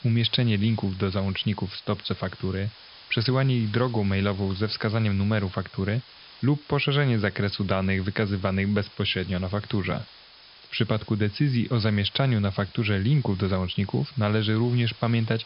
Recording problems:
high frequencies cut off; noticeable; nothing above 5.5 kHz
hiss; faint; throughout; 20 dB below the speech

